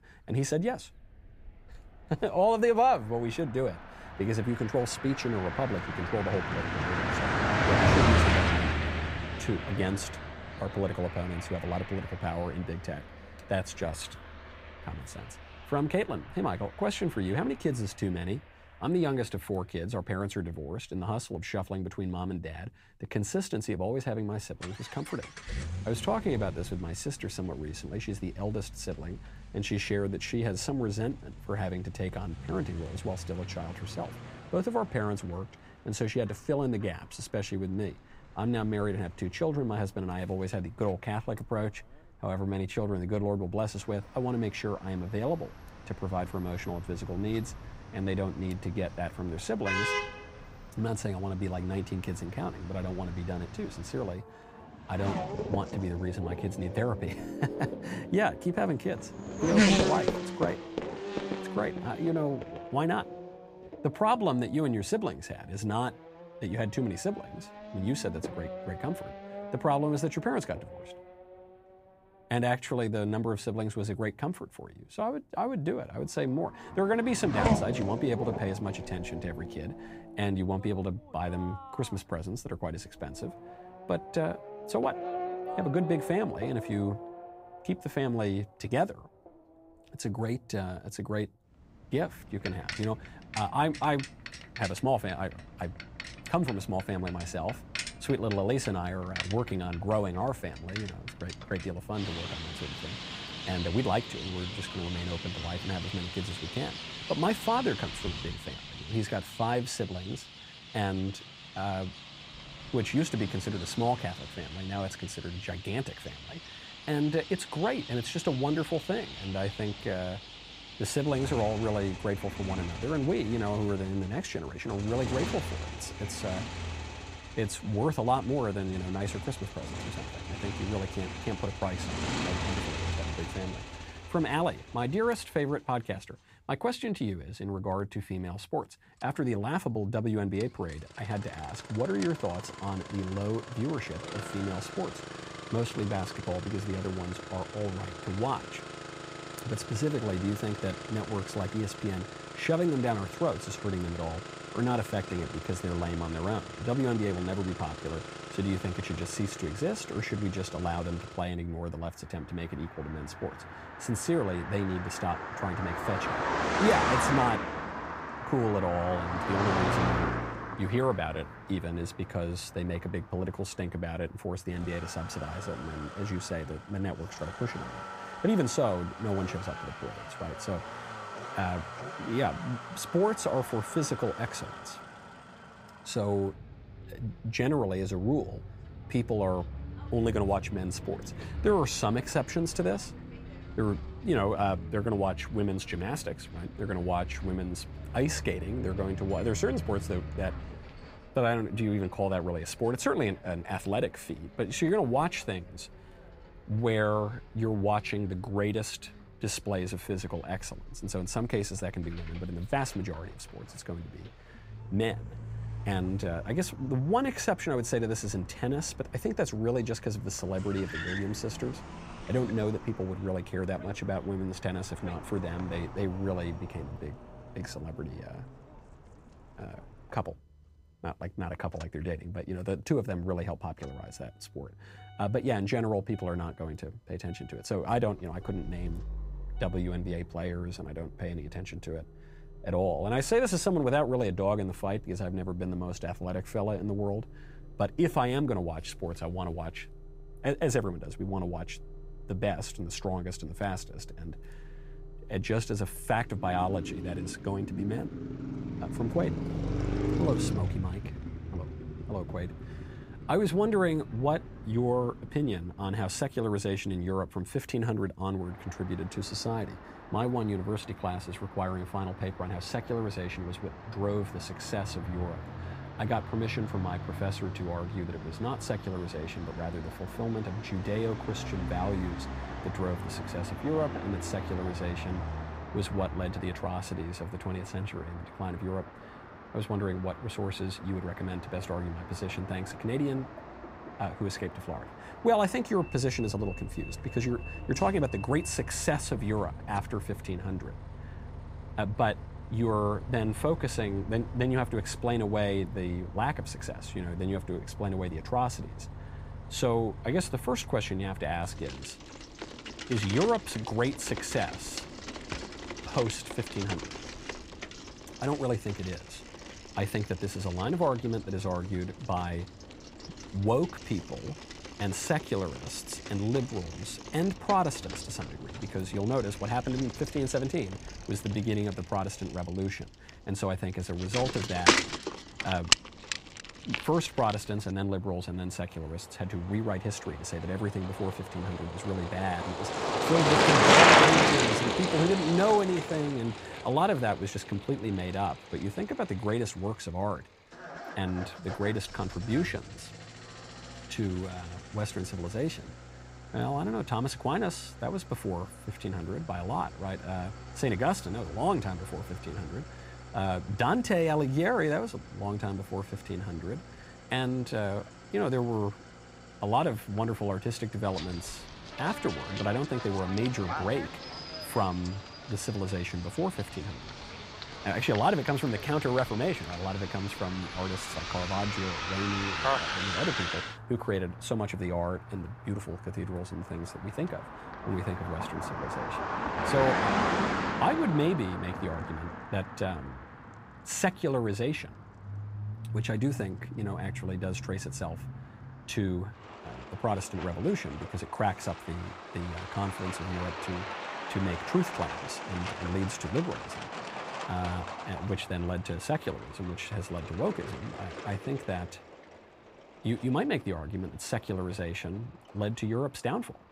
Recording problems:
traffic noise; loud; throughout; 3 dB below the speech

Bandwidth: 15.5 kHz